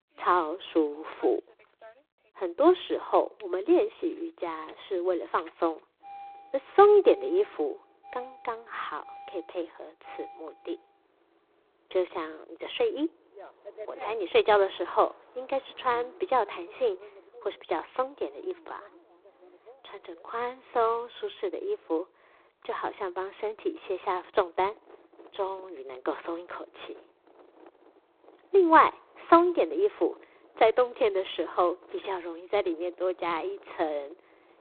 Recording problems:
phone-call audio; poor line
traffic noise; faint; throughout; 25 dB below the speech

